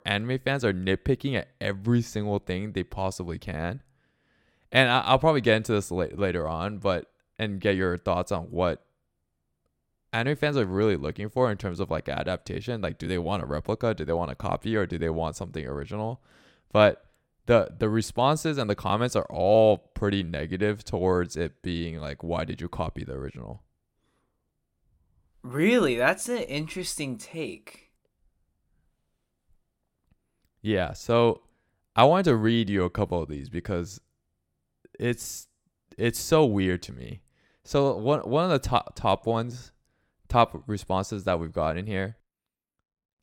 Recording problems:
none

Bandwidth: 16.5 kHz